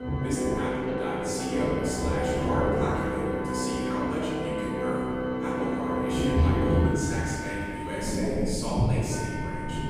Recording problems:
room echo; strong; dies away in 2.1 s
off-mic speech; far
background music; very loud; throughout; 2 dB above the speech
rain or running water; very loud; throughout; 3 dB above the speech

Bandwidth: 15 kHz